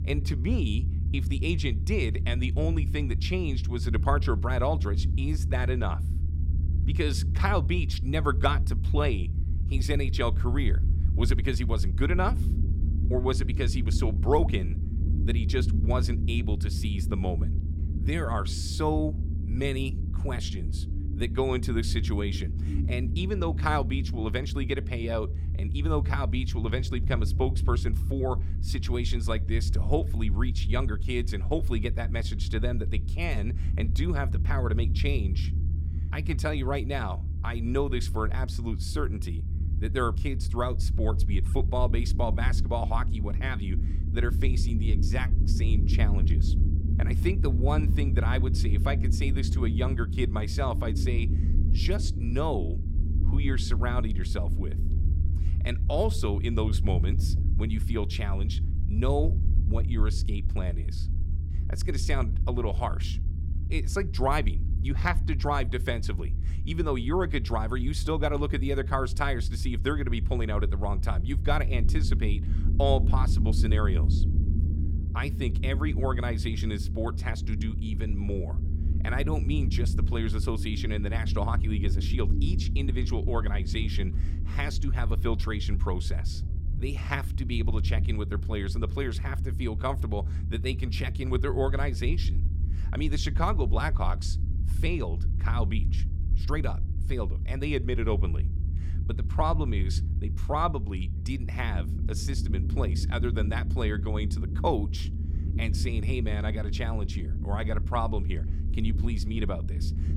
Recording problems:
low rumble; noticeable; throughout; 10 dB below the speech

